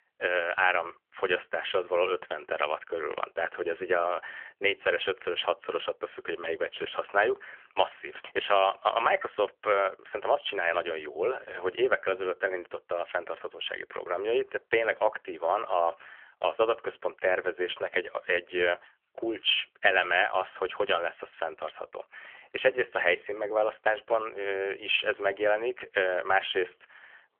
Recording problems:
phone-call audio; nothing above 3 kHz

